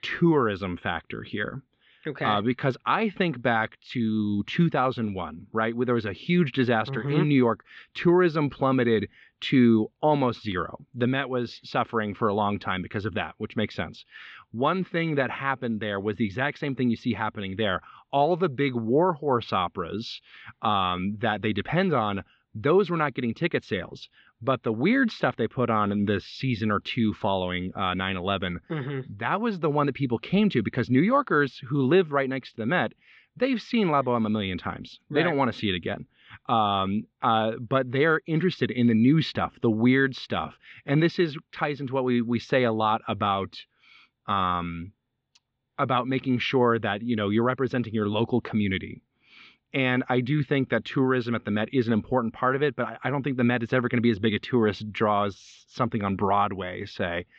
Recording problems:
muffled; very; fading above 4 kHz

